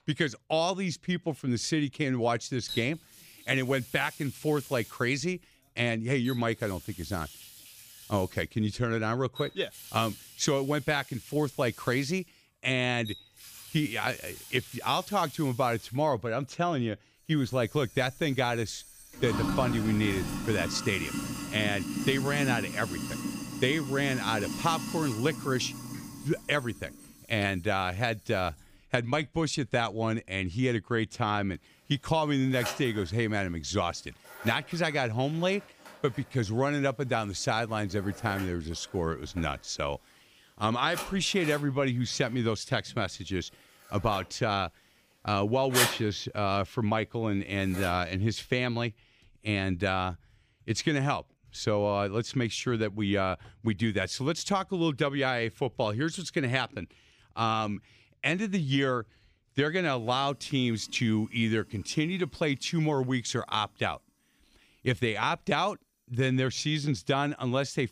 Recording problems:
household noises; loud; throughout; 9 dB below the speech

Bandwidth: 15 kHz